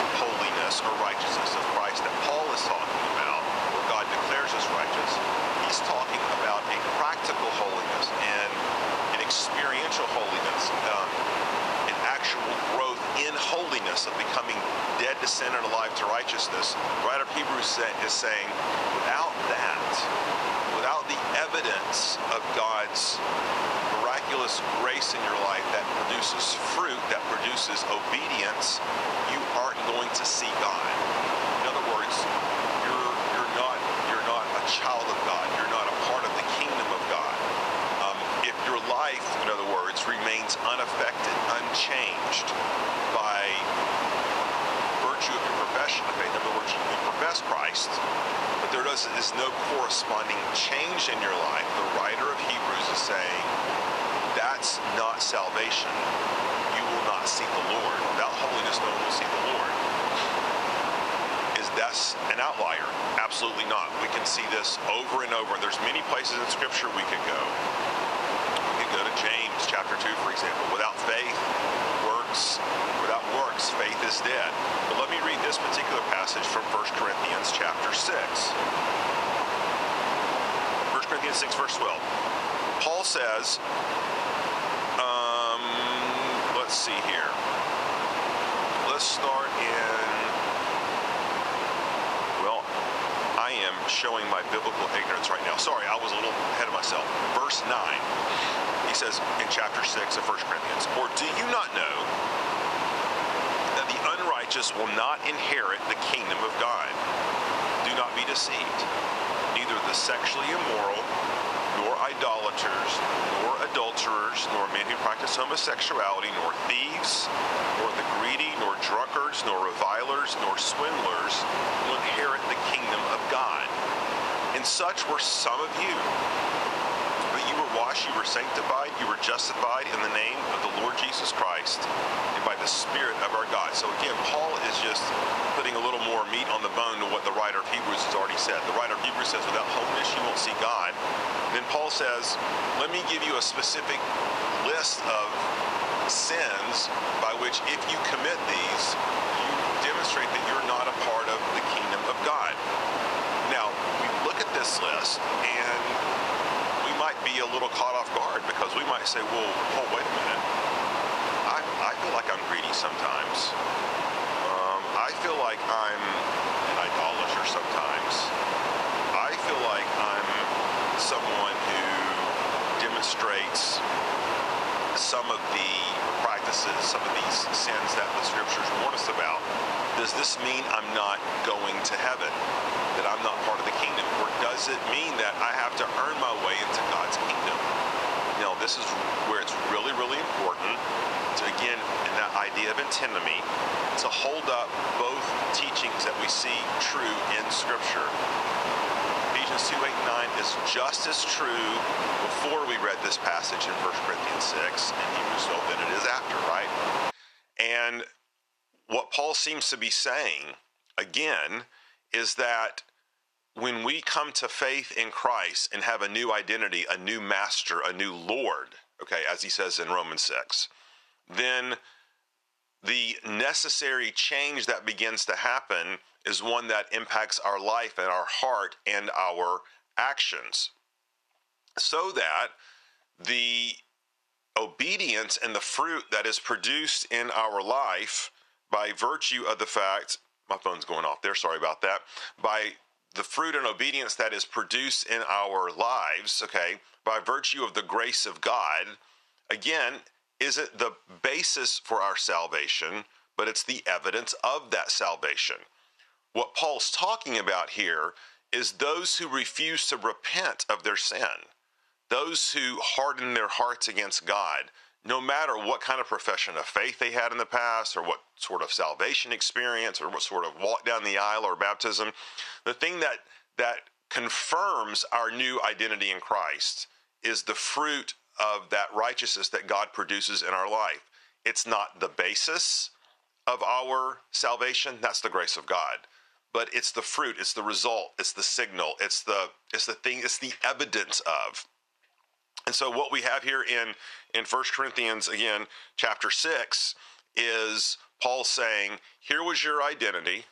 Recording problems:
thin; very; fading below 850 Hz
squashed, flat; somewhat
wind noise on the microphone; heavy; until 3:27; 1 dB below the speech

